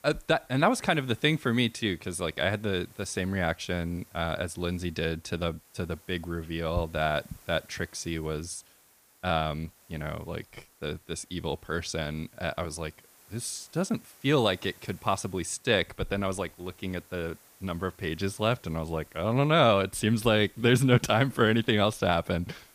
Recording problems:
hiss; faint; throughout; 25 dB below the speech

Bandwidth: 15 kHz